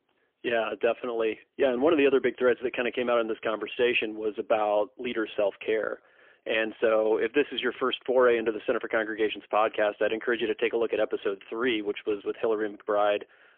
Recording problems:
phone-call audio; poor line; nothing above 3.5 kHz

